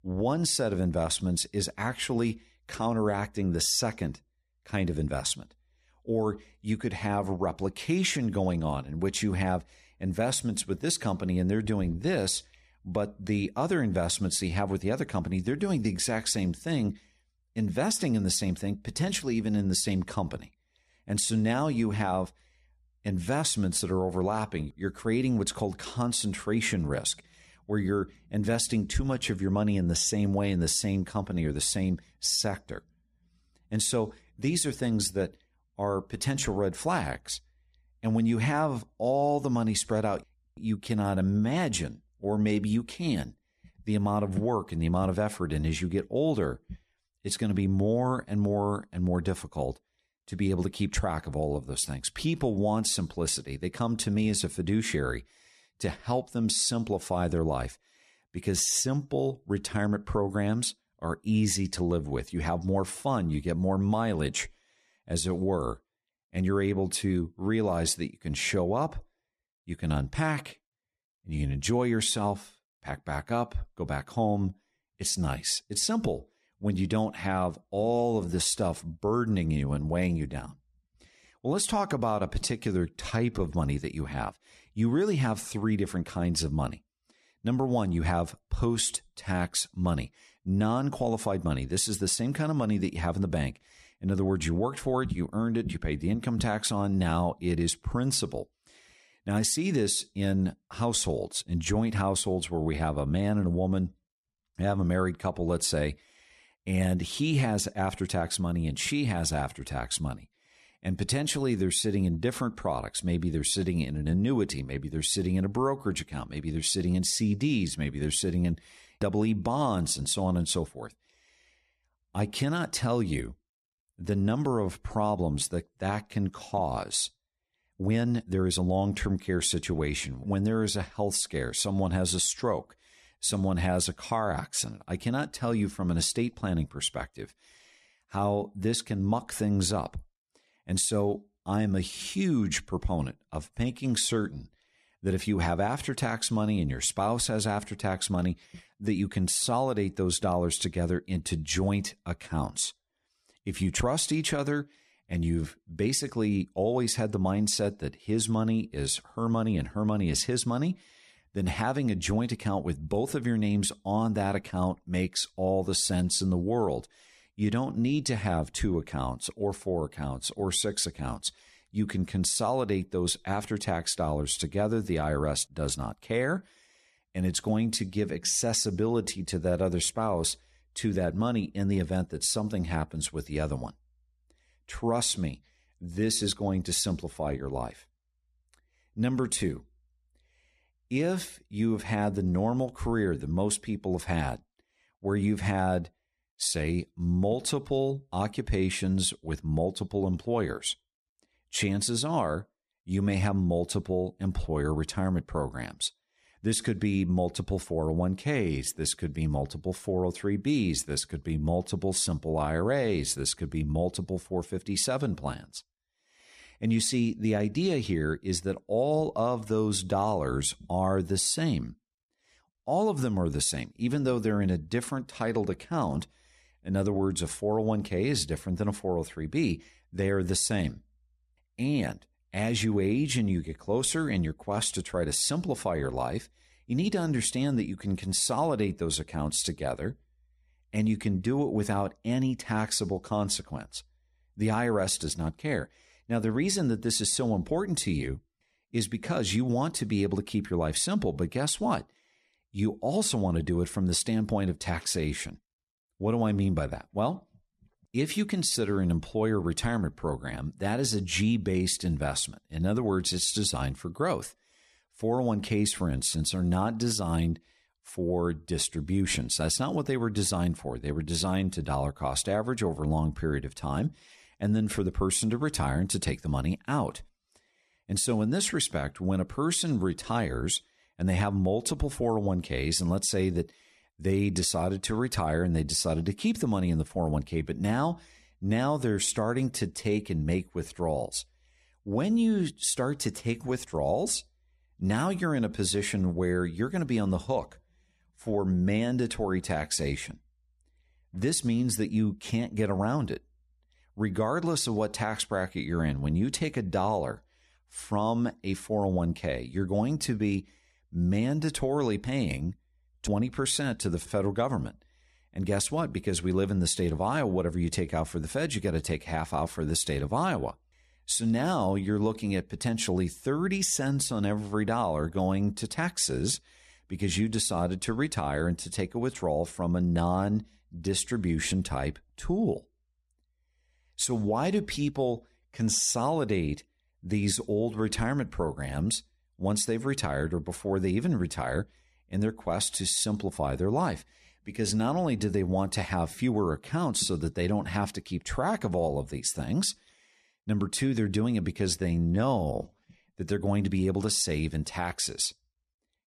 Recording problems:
uneven, jittery; strongly; from 1:22 to 5:53

